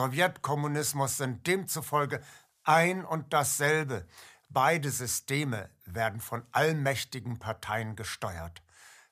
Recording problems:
abrupt cut into speech; at the start

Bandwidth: 15 kHz